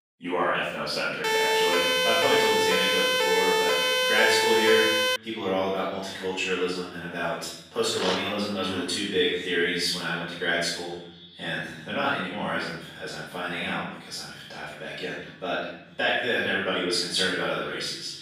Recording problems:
room echo; strong; dies away in 0.9 s
off-mic speech; far
thin; somewhat; fading below 350 Hz
echo of what is said; faint; throughout; 480 ms later, 25 dB below the speech
siren; loud; from 1 to 5 s; peak 6 dB above the speech
dog barking; noticeable; at 8 s; peak 2 dB below the speech

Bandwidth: 15 kHz